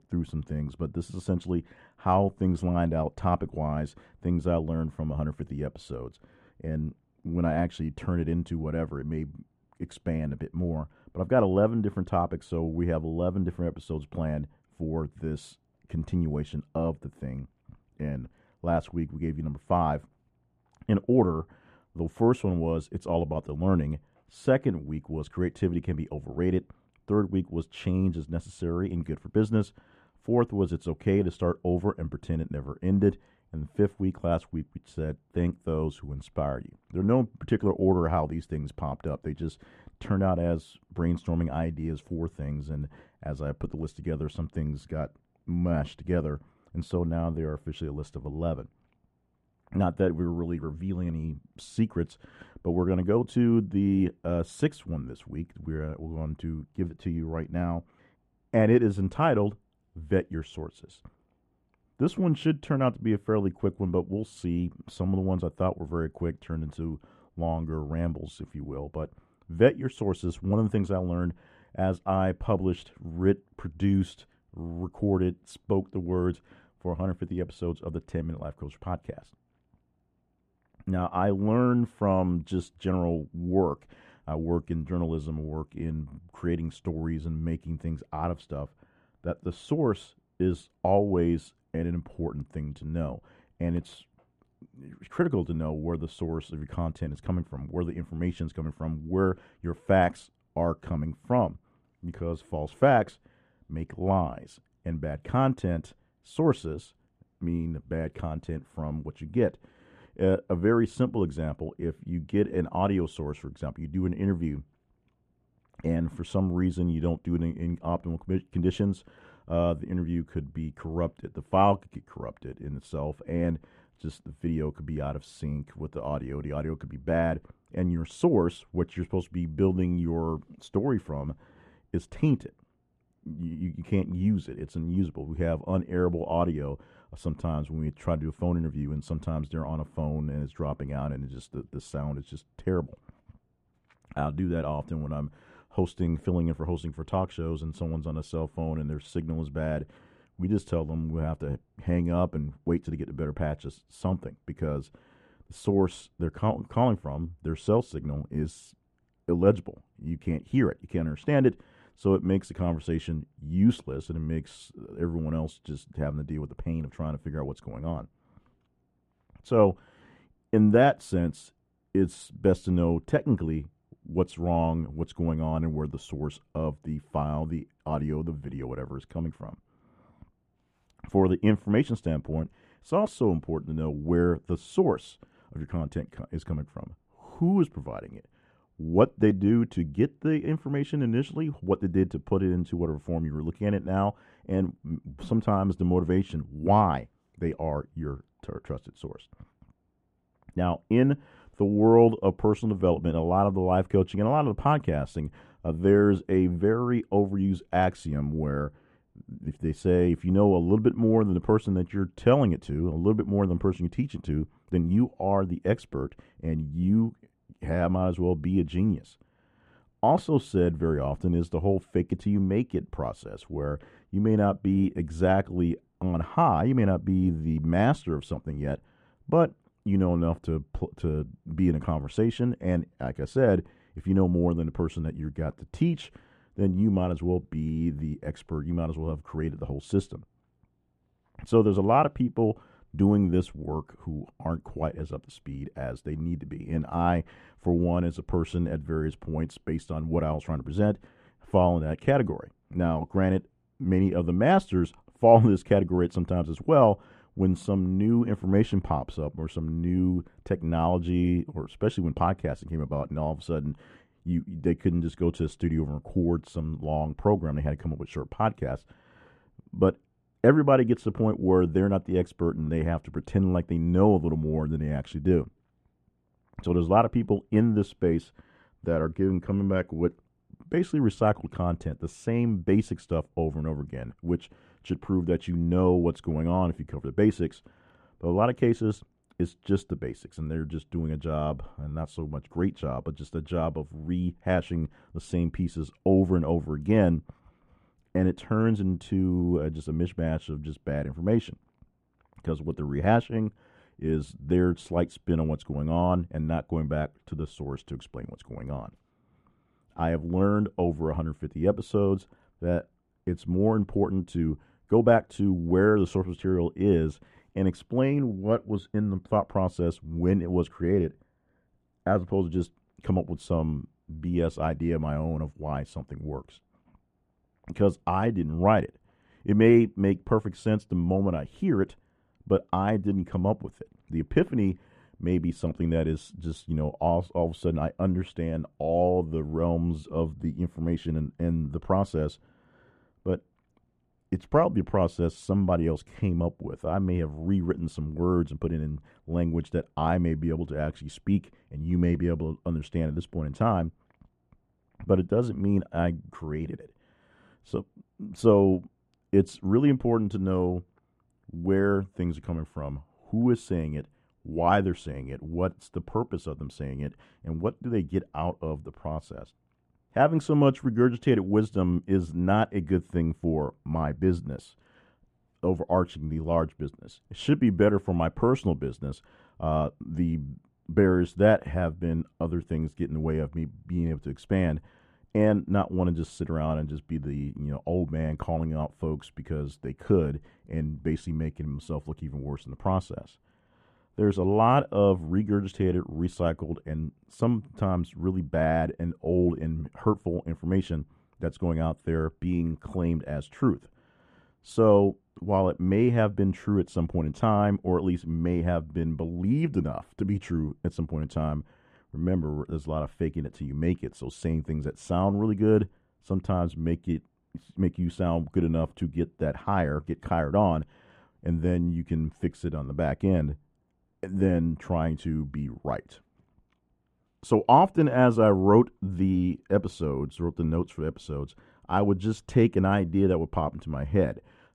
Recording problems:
muffled; very; fading above 3 kHz

